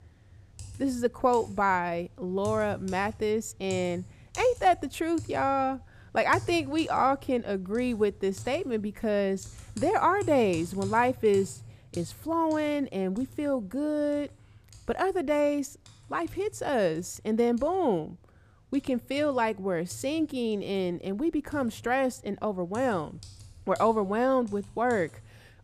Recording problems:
household noises; noticeable; throughout; 20 dB below the speech

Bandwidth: 14.5 kHz